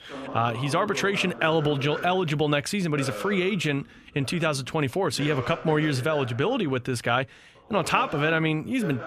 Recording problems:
voice in the background; noticeable; throughout; 15 dB below the speech

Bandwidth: 14.5 kHz